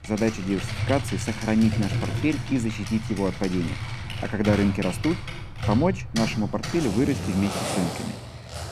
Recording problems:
household noises; loud; throughout; 5 dB below the speech
machinery noise; faint; throughout; 20 dB below the speech

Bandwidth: 14 kHz